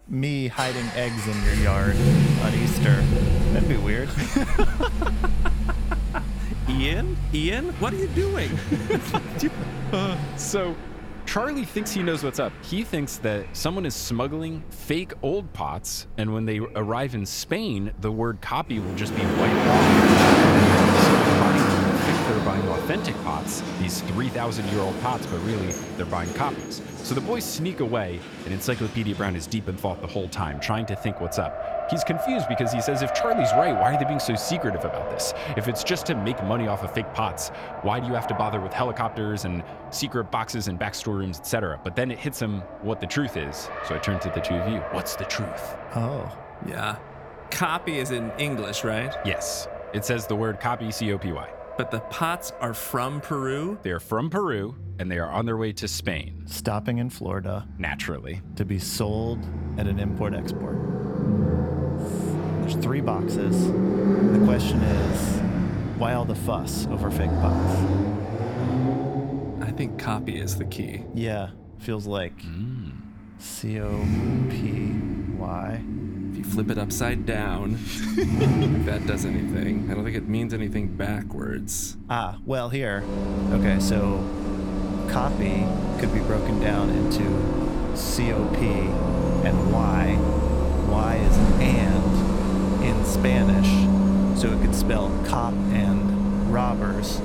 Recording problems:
traffic noise; very loud; throughout; 4 dB above the speech

